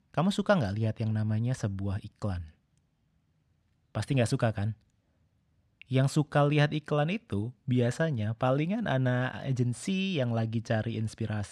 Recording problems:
none

